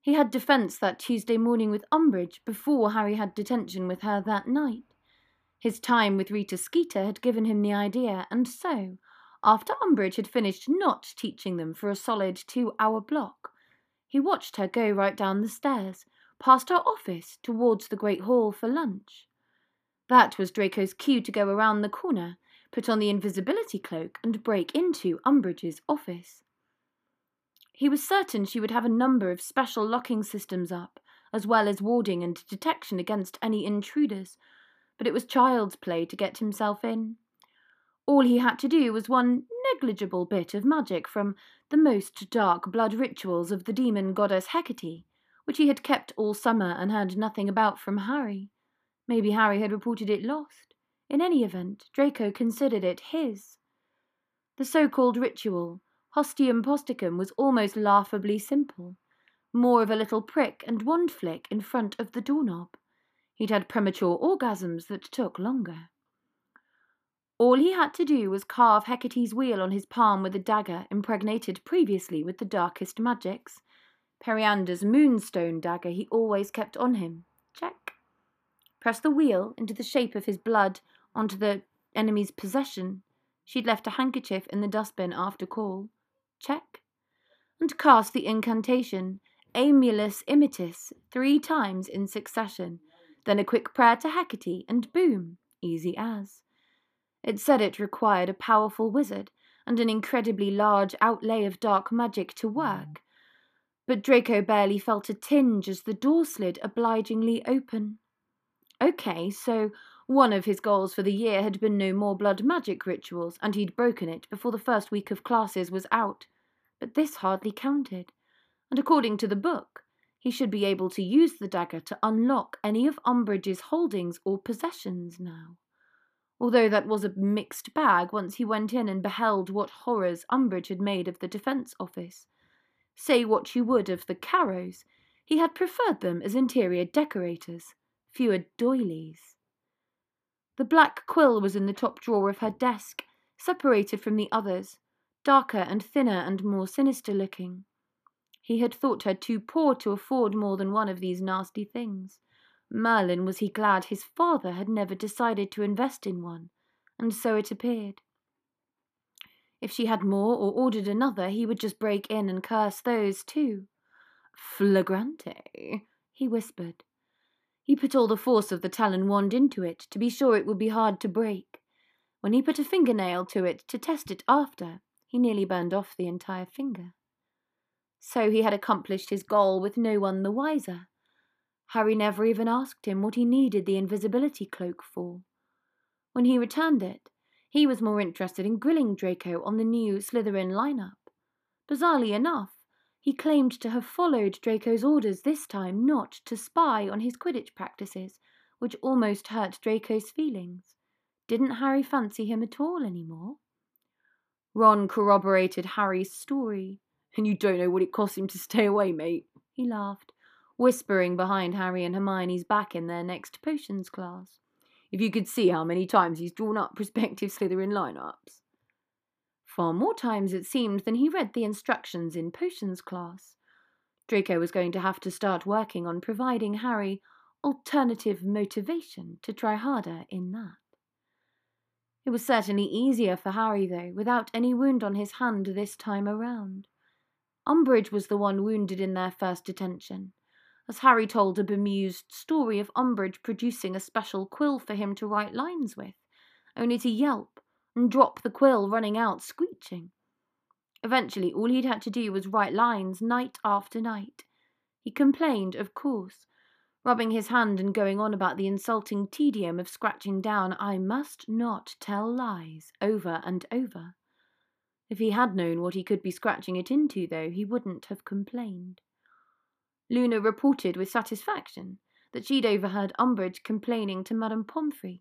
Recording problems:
muffled; slightly; fading above 2.5 kHz

